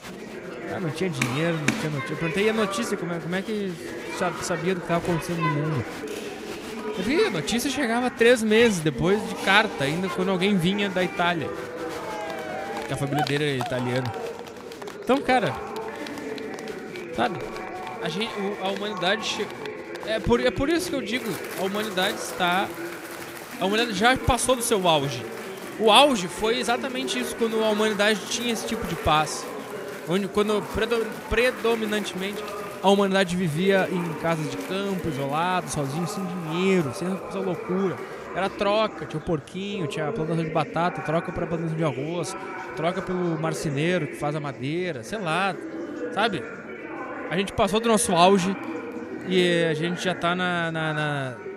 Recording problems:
chatter from many people; loud; throughout; 9 dB below the speech

